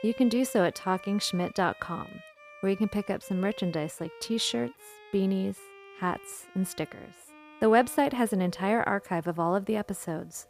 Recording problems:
background music; noticeable; throughout; 20 dB below the speech

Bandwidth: 15 kHz